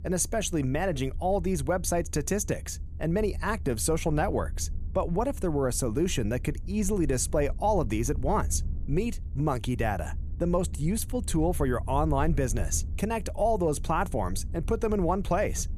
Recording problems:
low rumble; faint; throughout; 25 dB below the speech

